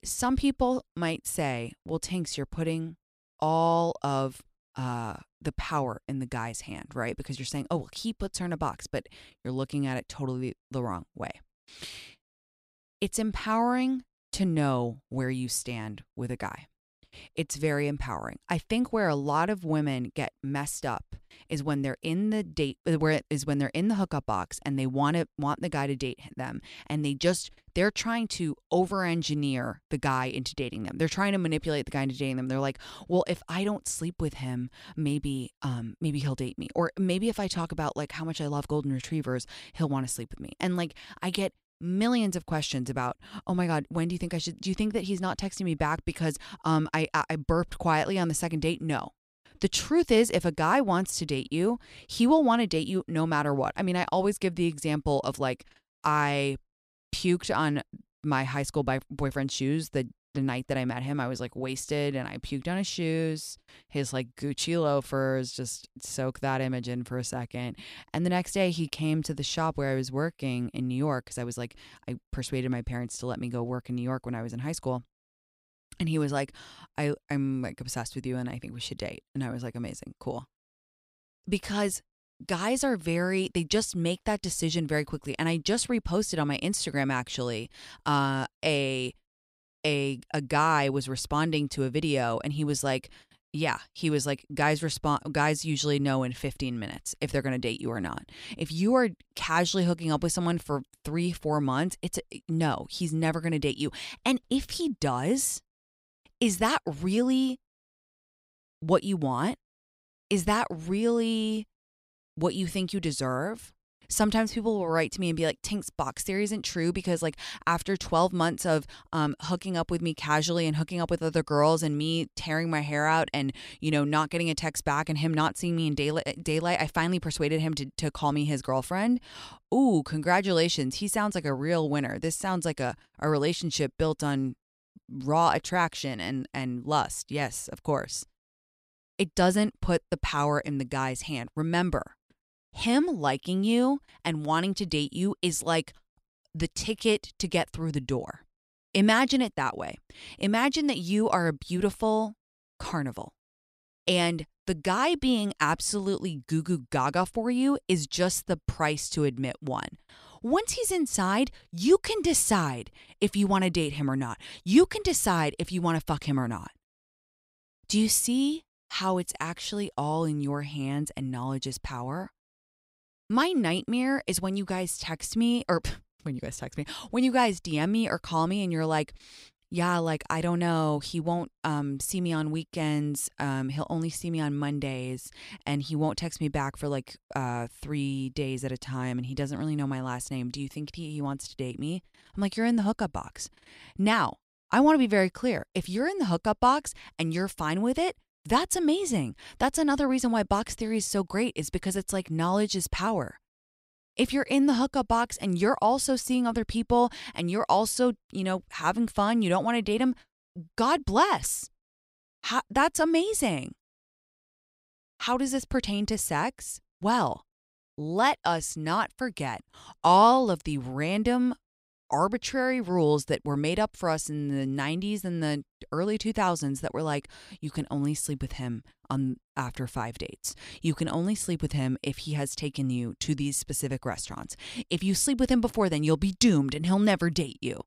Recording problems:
none

